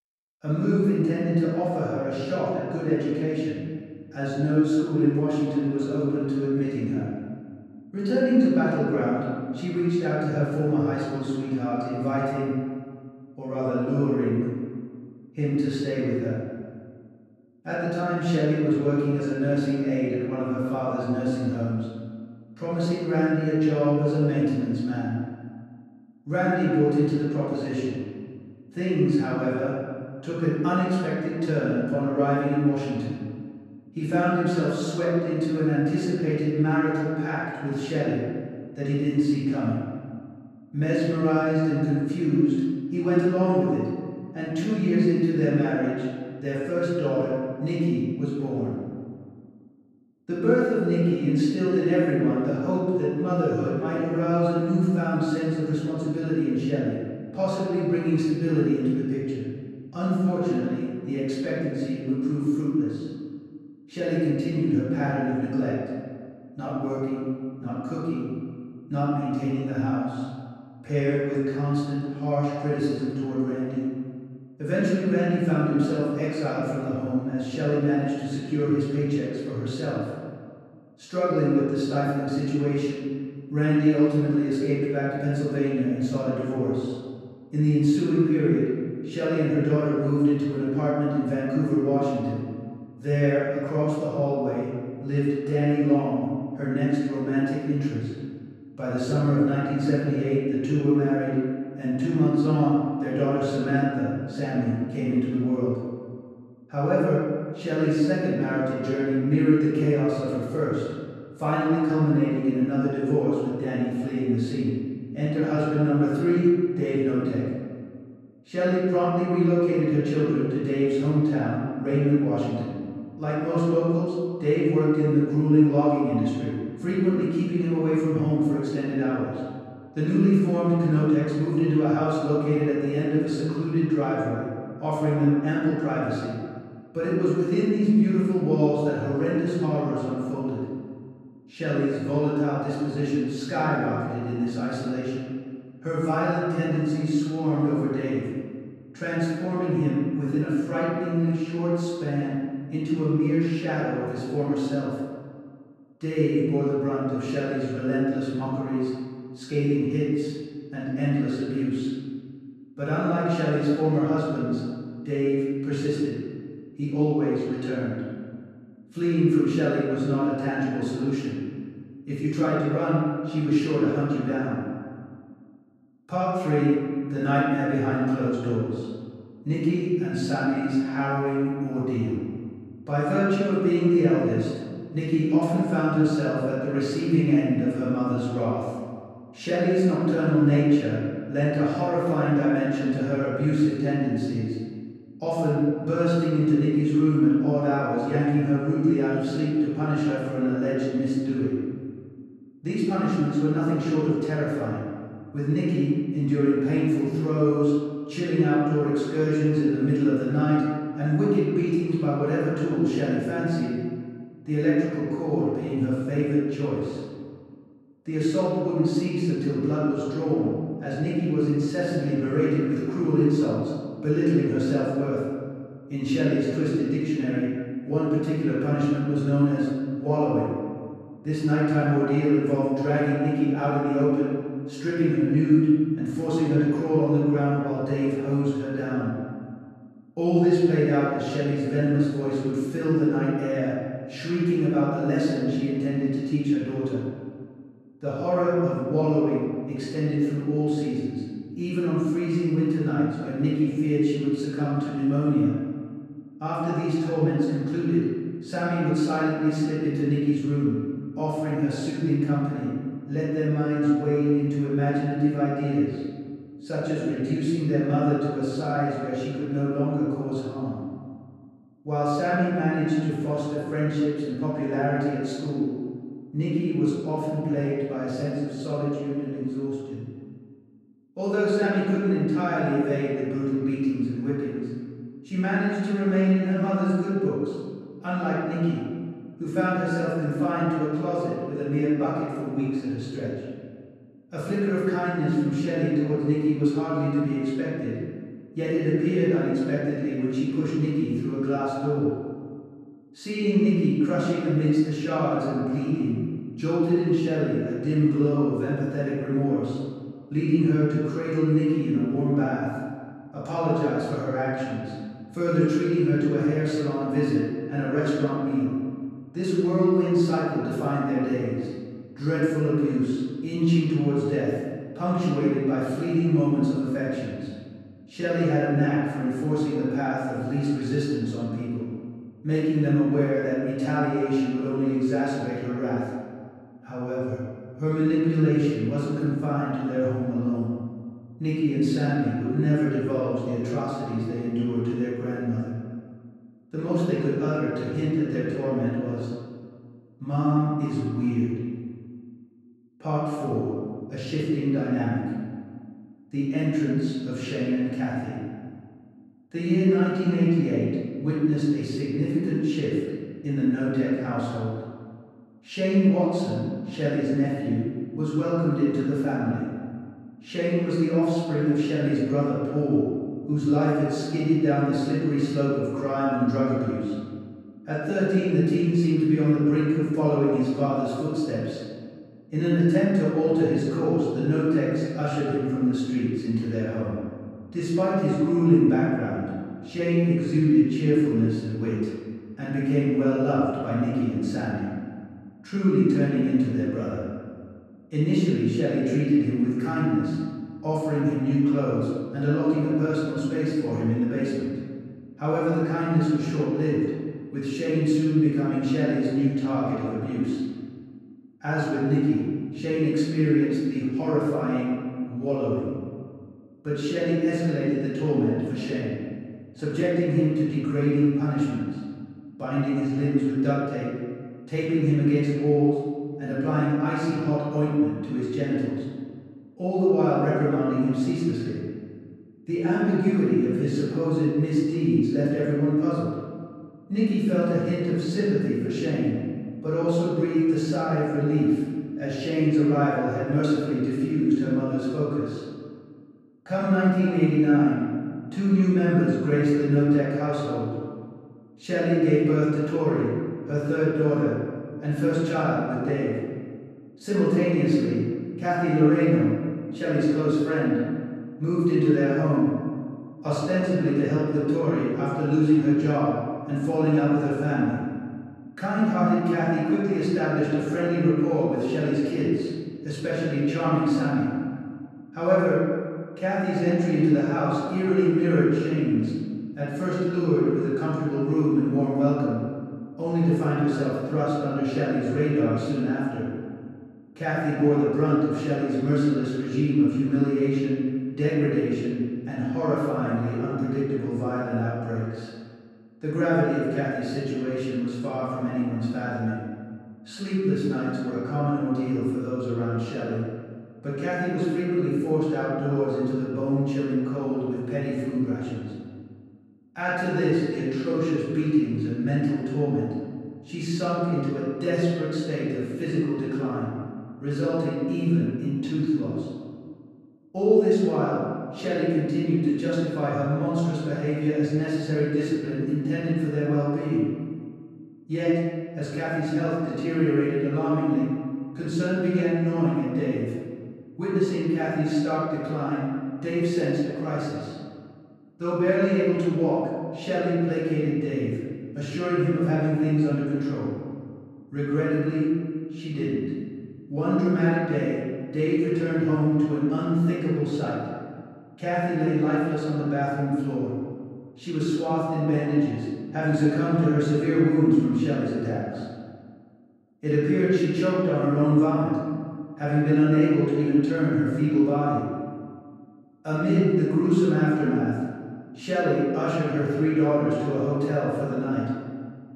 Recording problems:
room echo; strong; dies away in 1.7 s
off-mic speech; far

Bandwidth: 13.5 kHz